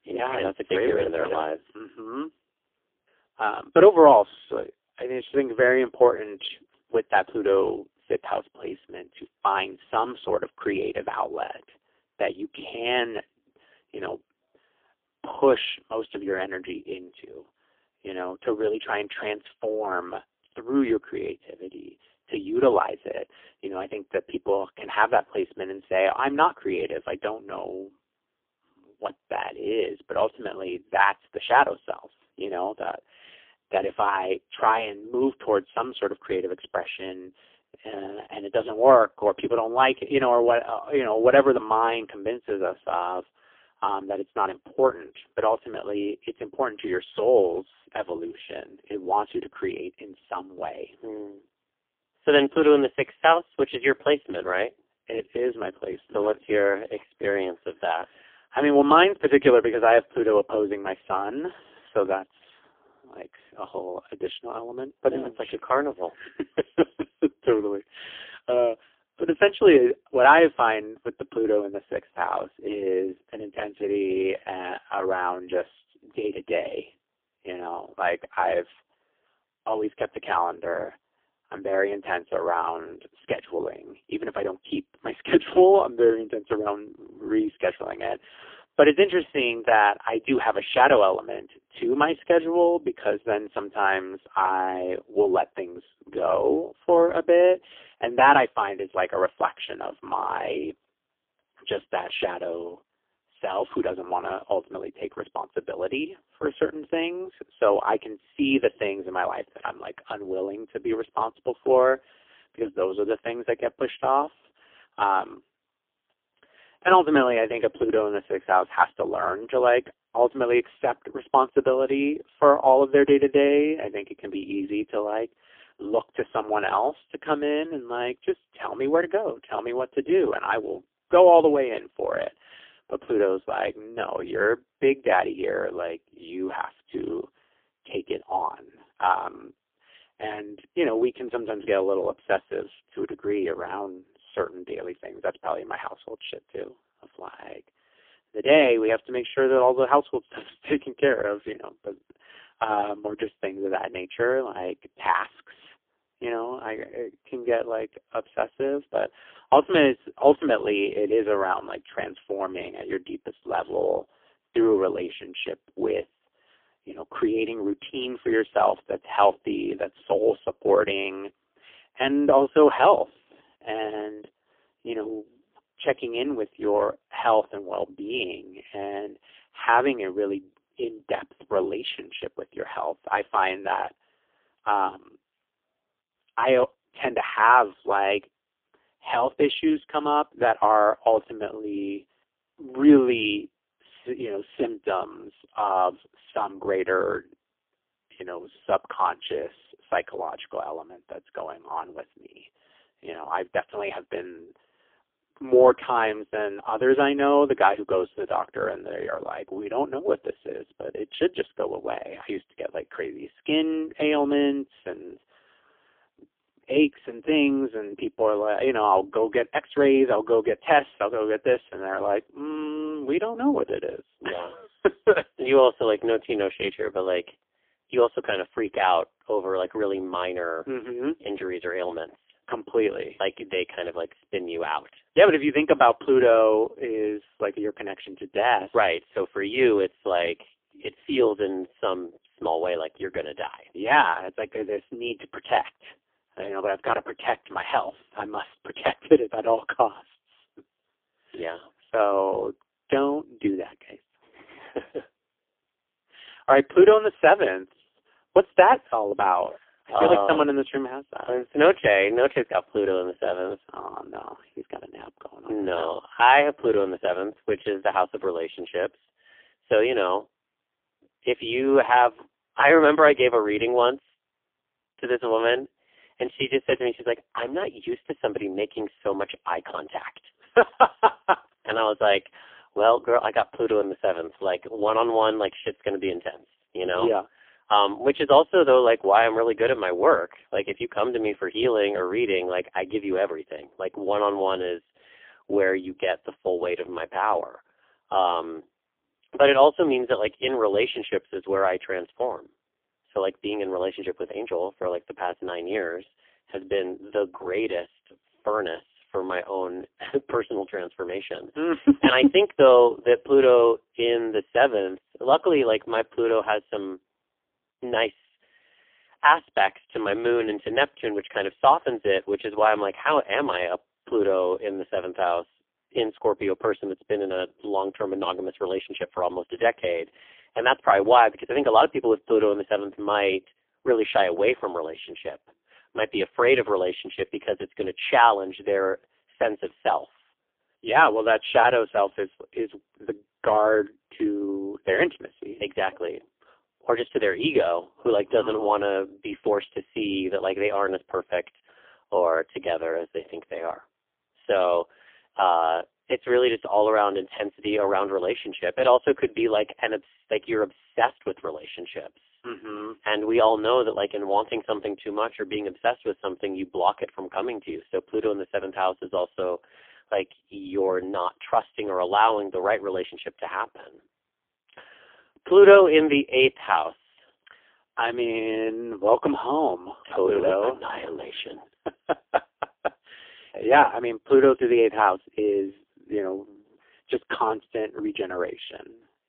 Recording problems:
phone-call audio; poor line; nothing above 3.5 kHz

